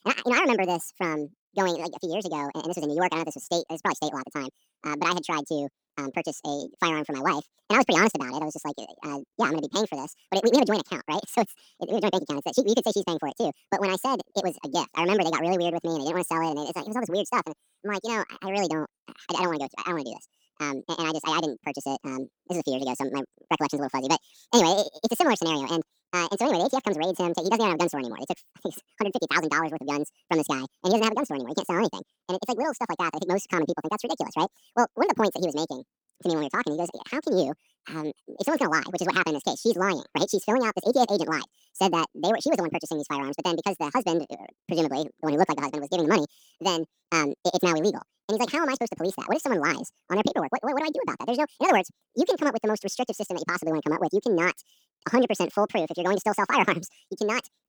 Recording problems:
wrong speed and pitch; too fast and too high; 1.7 times normal speed

